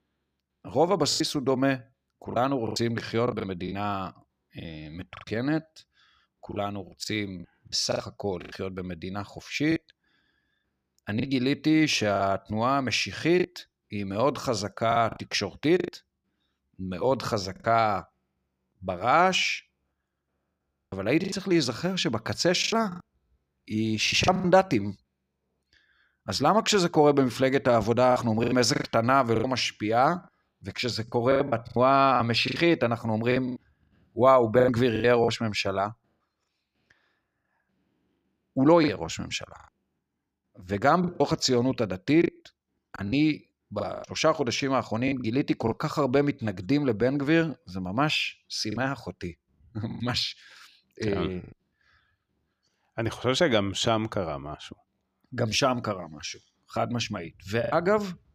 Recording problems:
choppy; very; 7% of the speech affected

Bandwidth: 14.5 kHz